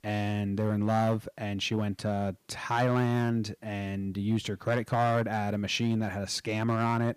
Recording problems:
distortion; slight; 4% of the sound clipped

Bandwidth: 15 kHz